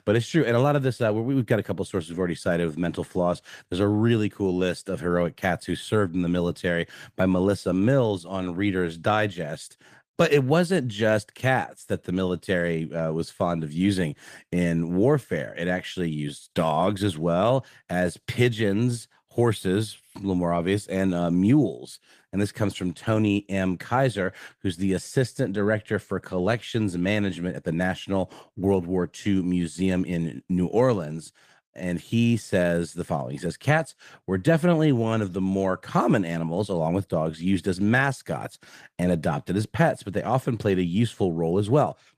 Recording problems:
garbled, watery; slightly; nothing above 14.5 kHz

